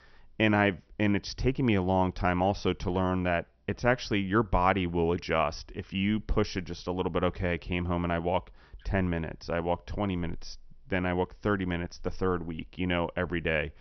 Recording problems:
high frequencies cut off; noticeable; nothing above 6 kHz

